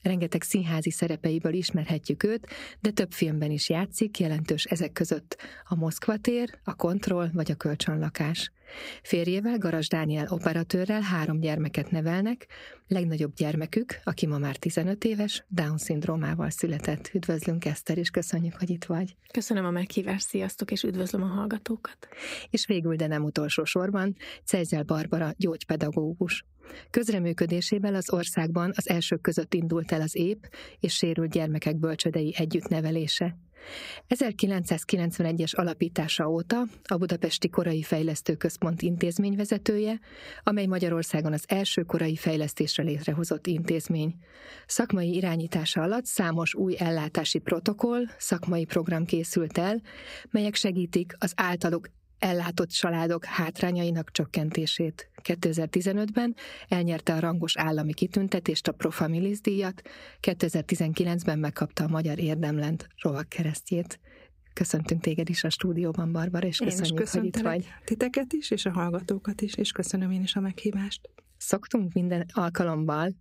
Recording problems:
squashed, flat; somewhat

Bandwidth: 15.5 kHz